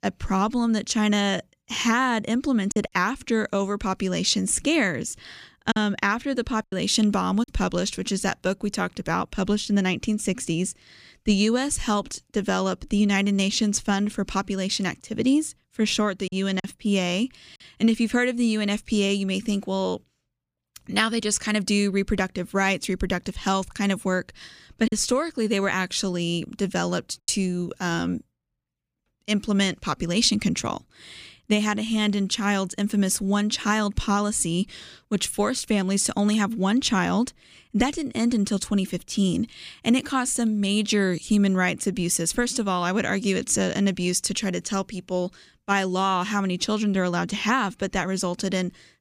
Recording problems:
choppy; occasionally; from 2.5 to 7.5 s, at 16 s and from 25 to 27 s; 4% of the speech affected

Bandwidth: 15 kHz